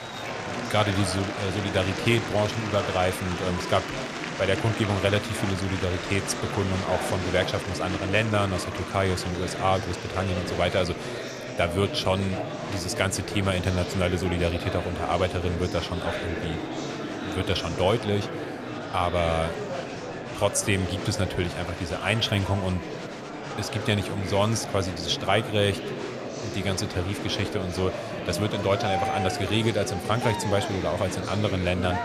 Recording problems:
murmuring crowd; loud; throughout; 5 dB below the speech

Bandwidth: 14.5 kHz